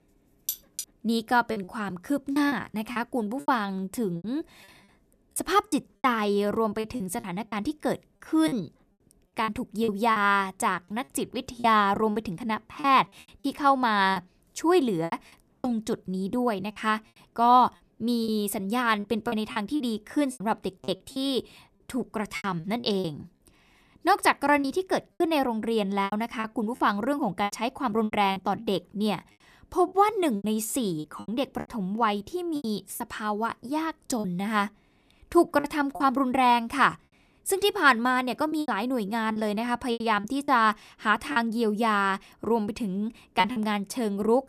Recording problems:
choppy; very; 10% of the speech affected
clattering dishes; noticeable; at 0.5 s; peak 6 dB below the speech

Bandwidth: 14.5 kHz